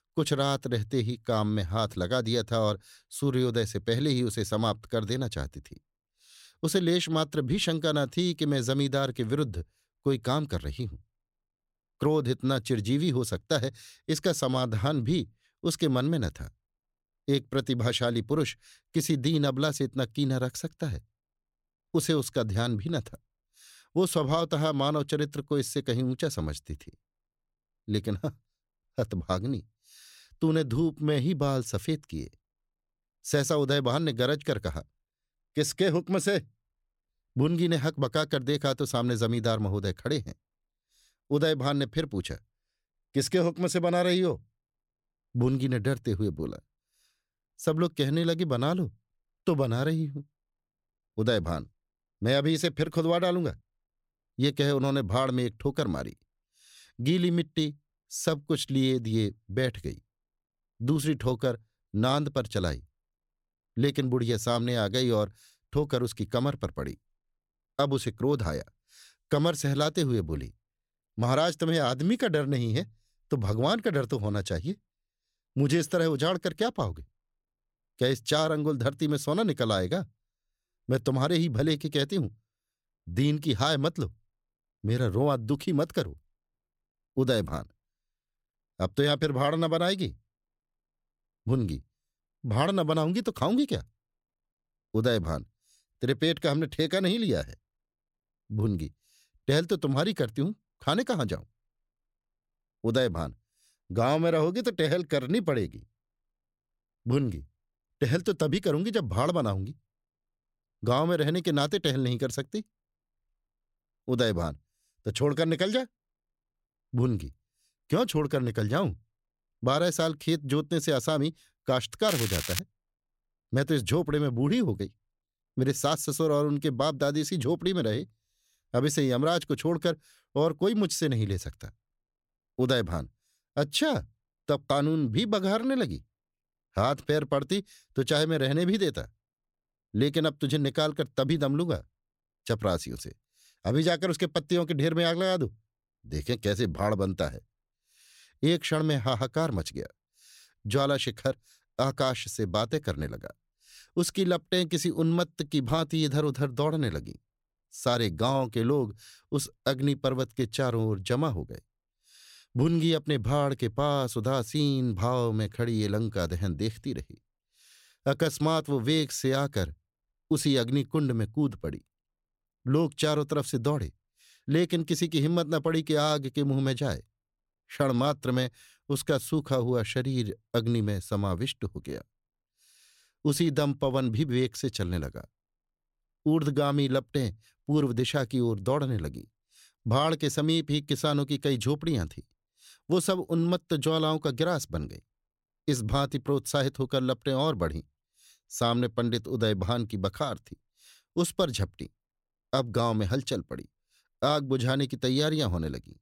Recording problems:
crackling; loud; at 2:02; 4 dB below the speech

